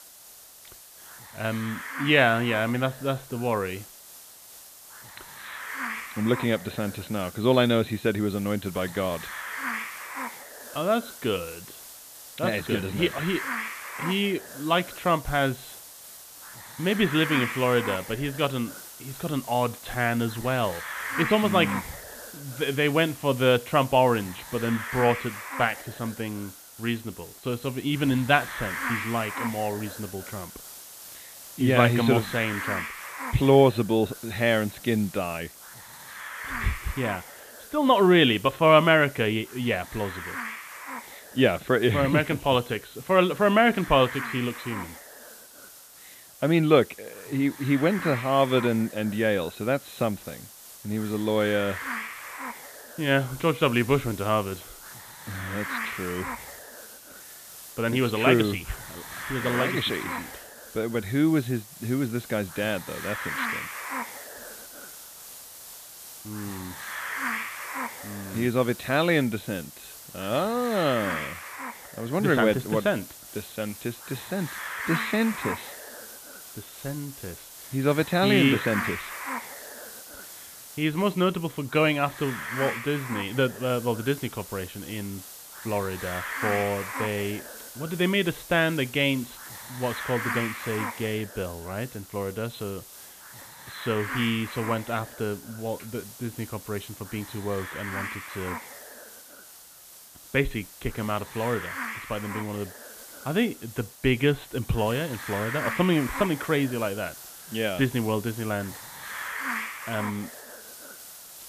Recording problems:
high frequencies cut off; severe; nothing above 4 kHz
hiss; noticeable; throughout; 10 dB below the speech

